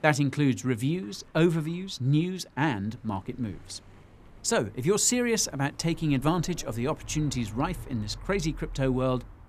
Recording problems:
traffic noise; noticeable; throughout; 20 dB below the speech

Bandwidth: 14.5 kHz